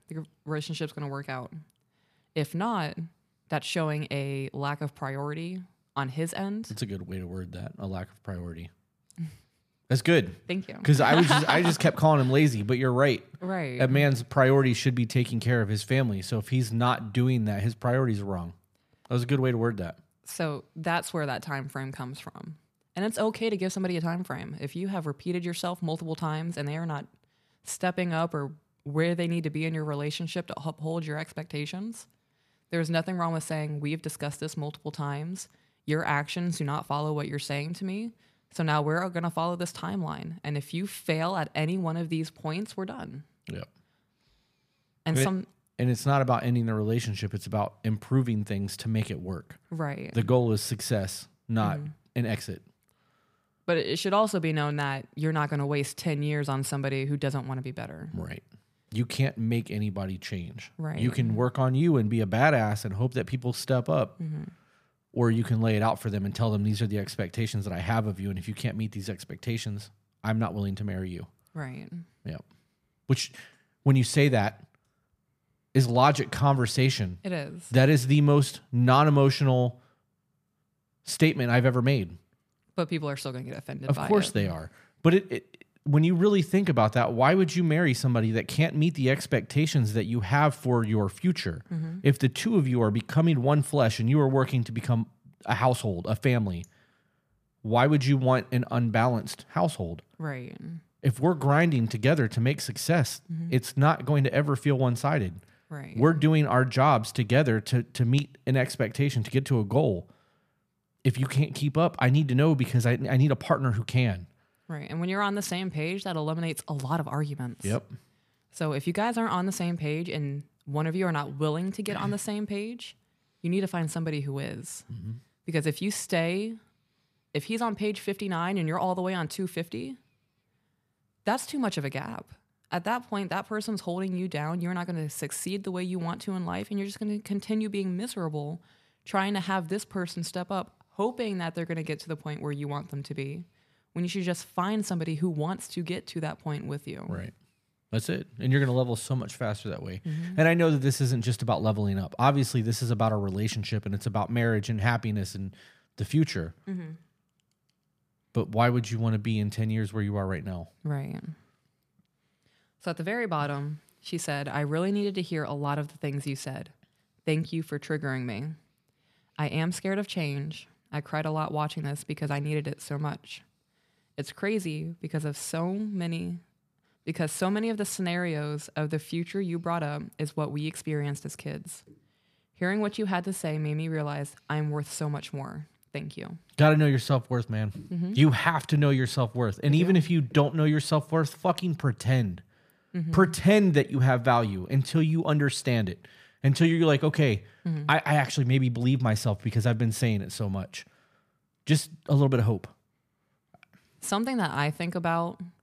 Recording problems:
none

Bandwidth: 15 kHz